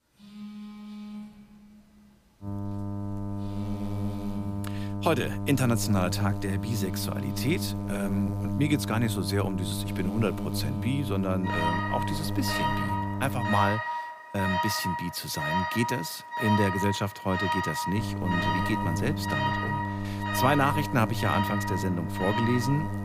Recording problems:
electrical hum; loud; from 2.5 to 14 s and from 18 s on; 50 Hz, 8 dB below the speech
alarms or sirens; loud; throughout; 3 dB below the speech

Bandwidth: 15 kHz